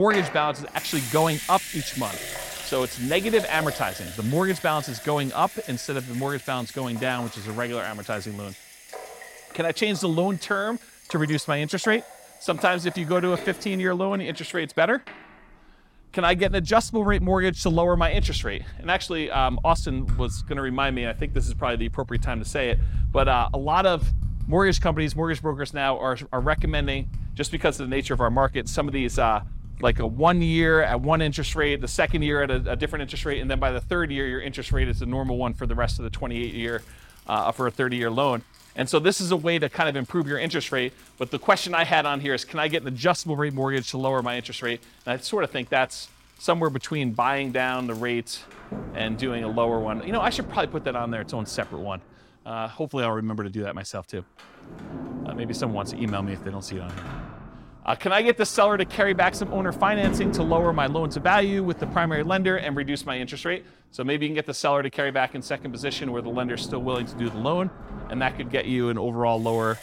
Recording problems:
household noises; loud; throughout; 9 dB below the speech
abrupt cut into speech; at the start

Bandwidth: 16.5 kHz